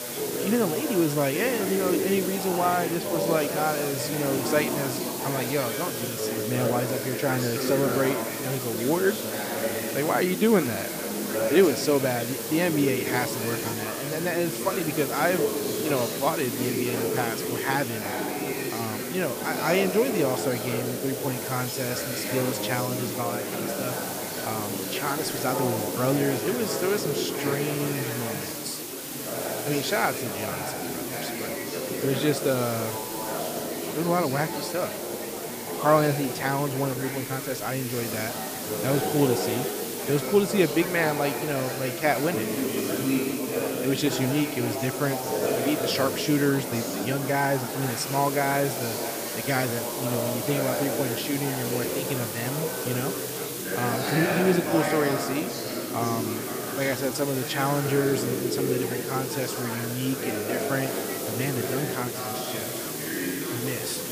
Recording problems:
chatter from many people; loud; throughout; 3 dB below the speech
hiss; loud; throughout; 6 dB below the speech

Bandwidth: 15 kHz